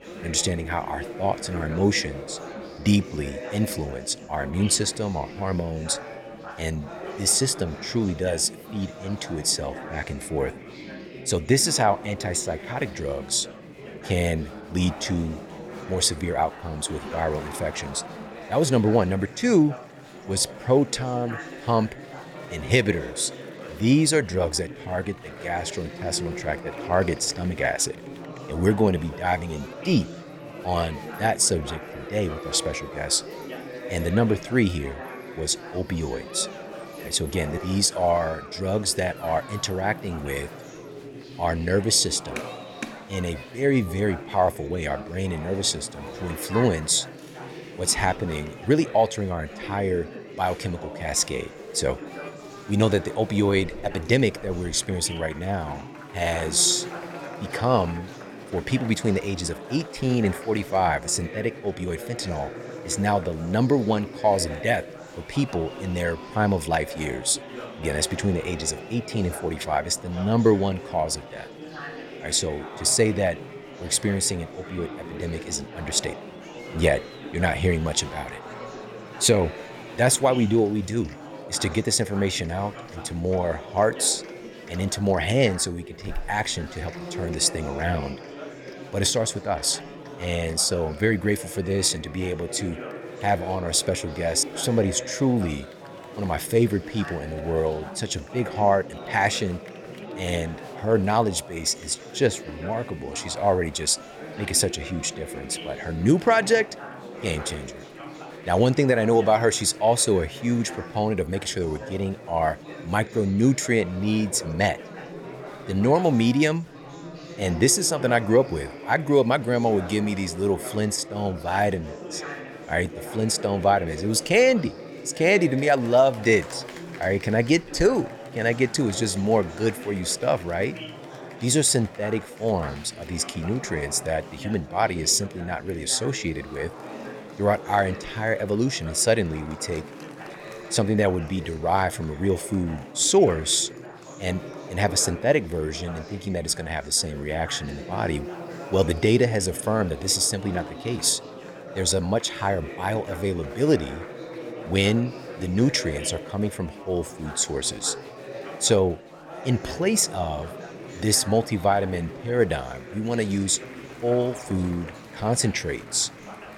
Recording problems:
chatter from many people; noticeable; throughout; 15 dB below the speech

